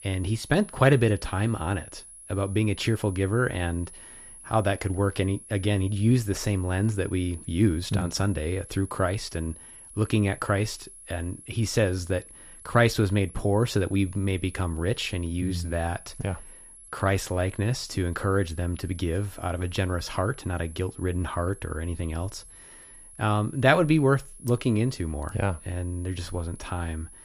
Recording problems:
high-pitched whine; noticeable; throughout; 10.5 kHz, 20 dB below the speech

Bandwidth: 14.5 kHz